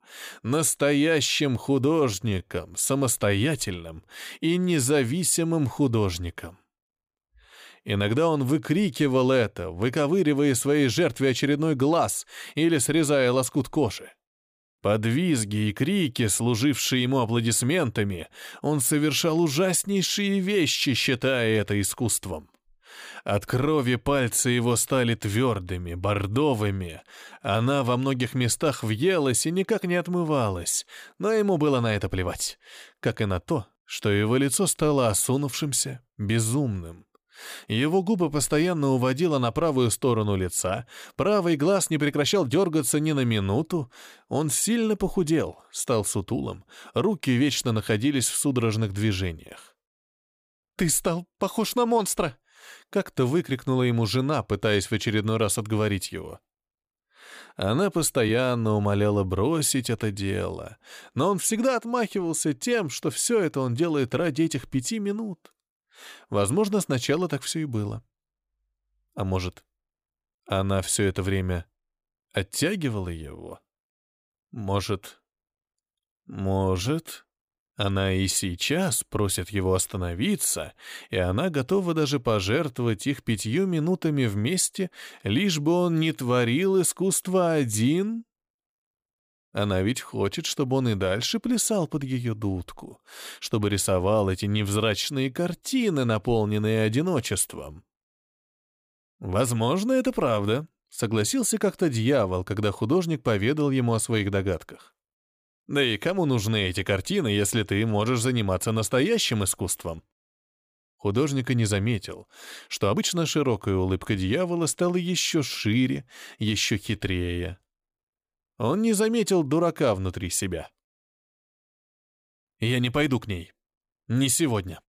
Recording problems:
uneven, jittery; strongly; from 2 s to 1:59

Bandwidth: 15 kHz